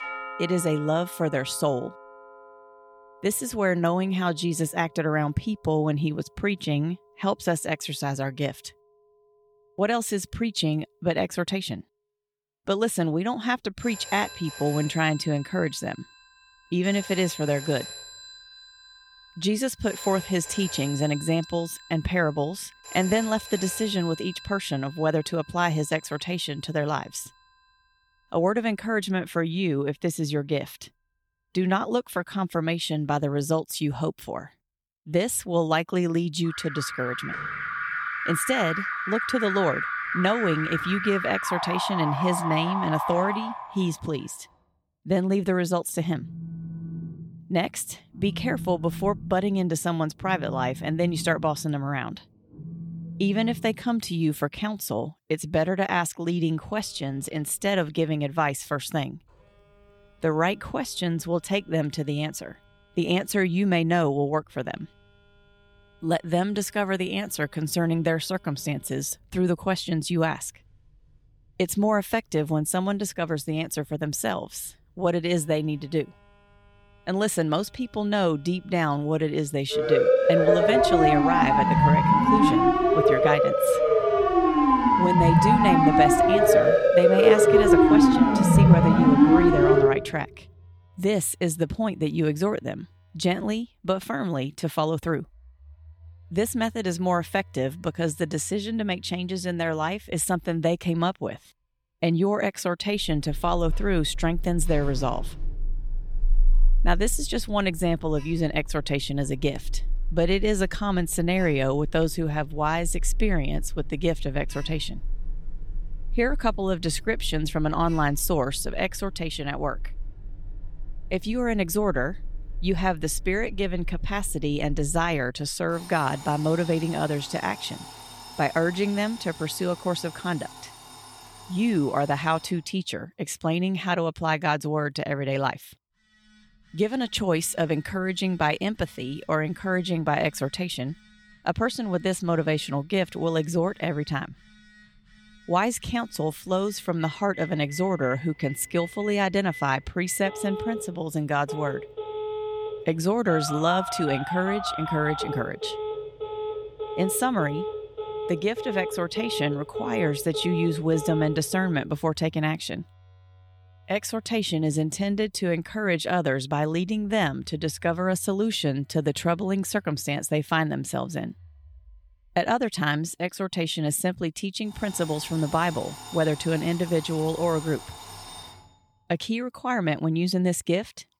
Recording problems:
alarms or sirens; very loud; throughout; 1 dB above the speech

